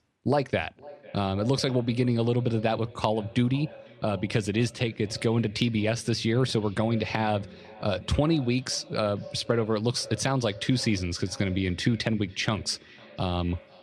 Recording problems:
echo of what is said; faint; throughout; 500 ms later, 20 dB below the speech

